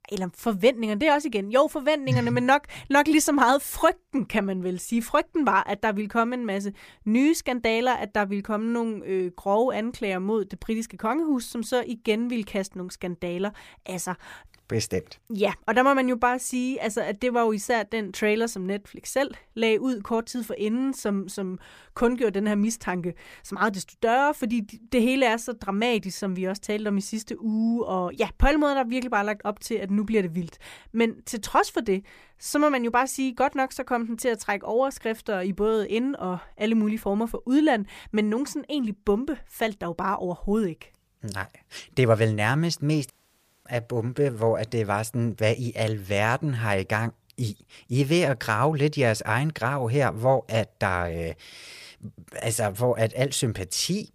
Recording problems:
audio cutting out; at 43 s for 0.5 s

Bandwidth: 15 kHz